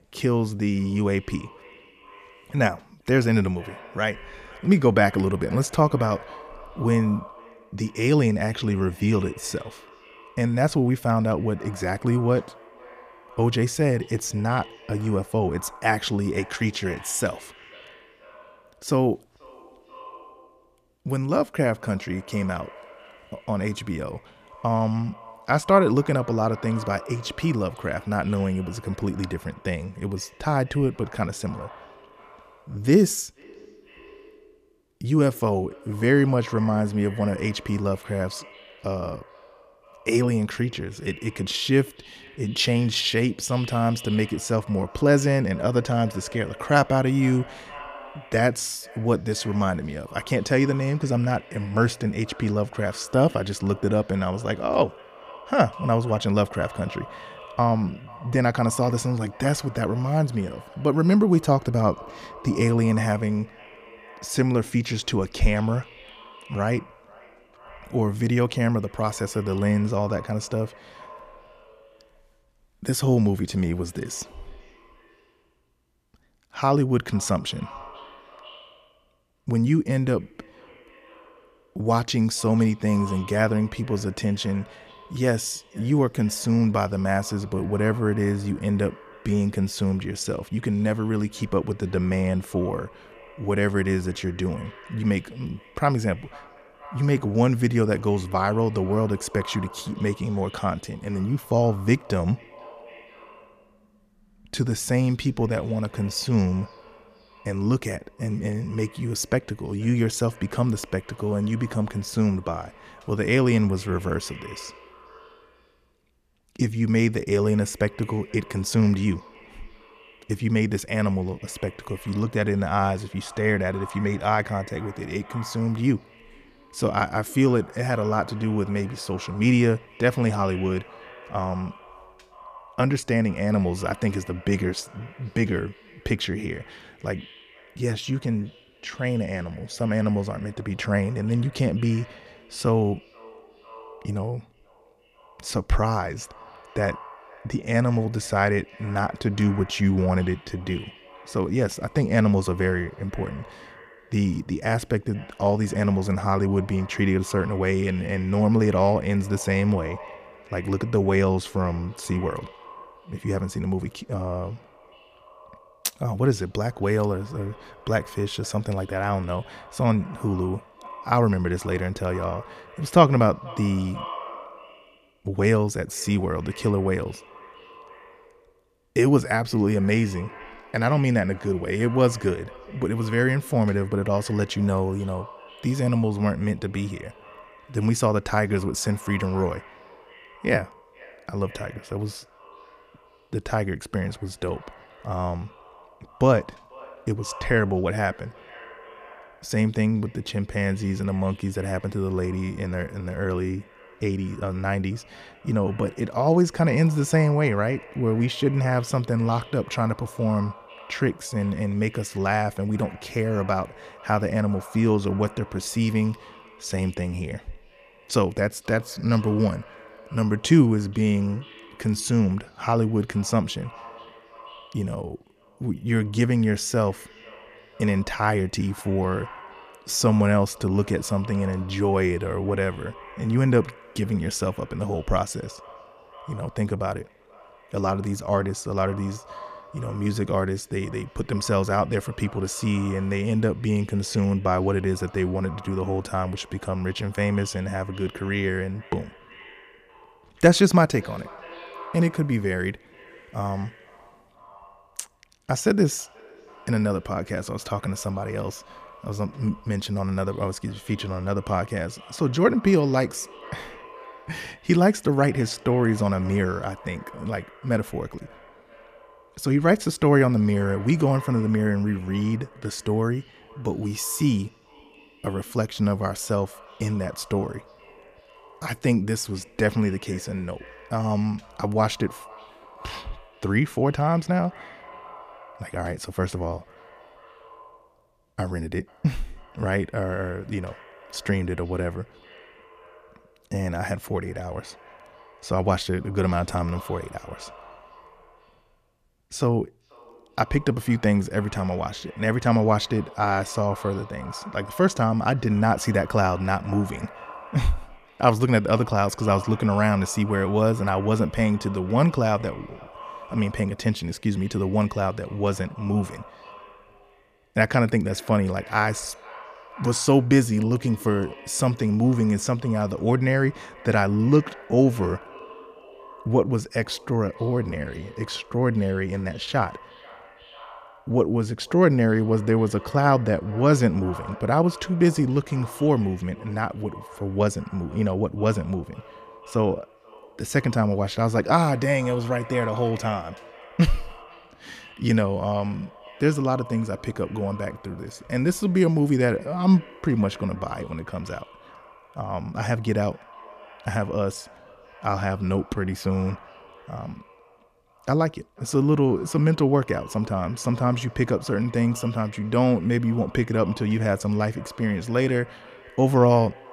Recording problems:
echo of what is said; faint; throughout; 490 ms later, 20 dB below the speech

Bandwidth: 14.5 kHz